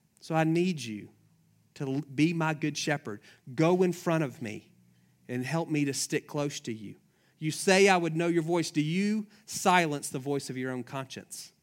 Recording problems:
none

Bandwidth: 16 kHz